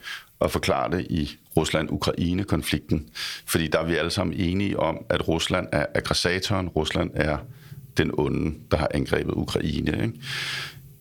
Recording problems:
squashed, flat; somewhat

